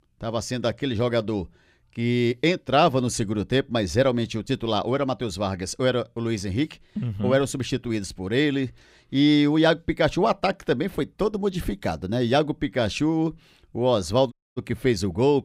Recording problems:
audio cutting out; at 14 s

